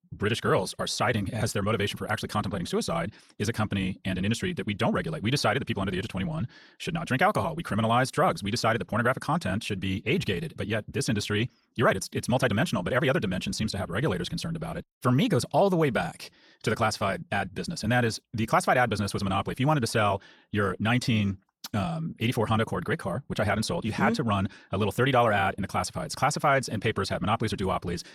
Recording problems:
wrong speed, natural pitch; too fast; 1.5 times normal speed

